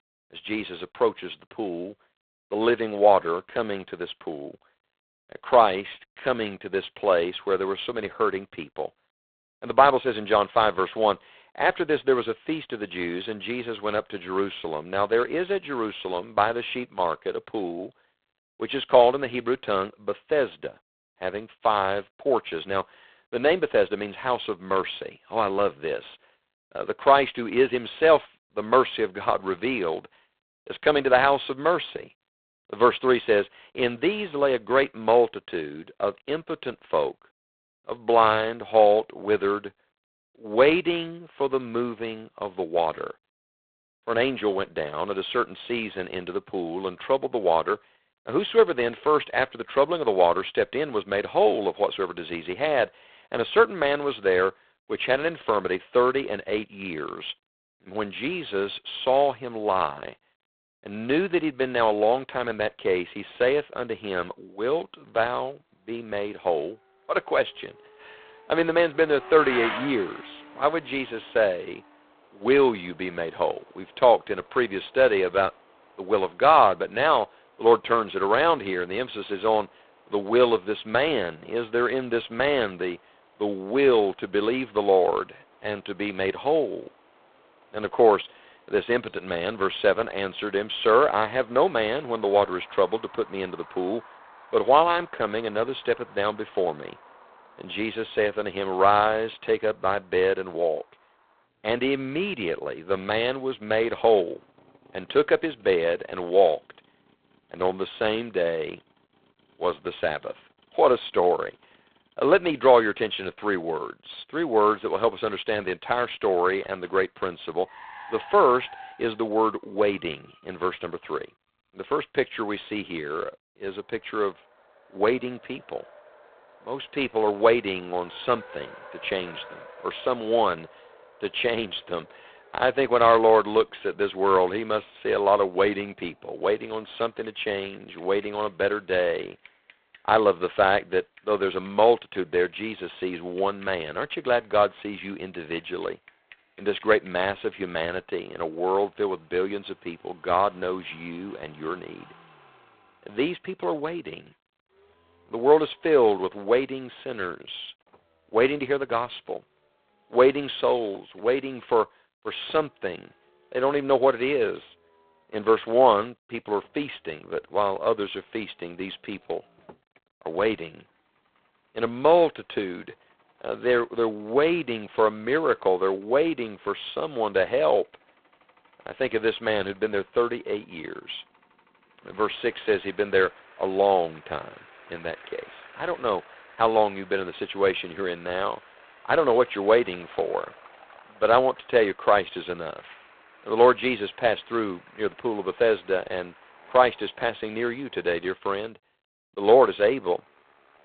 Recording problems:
phone-call audio; poor line; nothing above 4 kHz
traffic noise; faint; from 1:05 on; 25 dB below the speech

